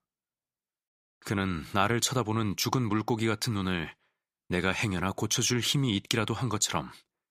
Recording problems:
none

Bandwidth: 15 kHz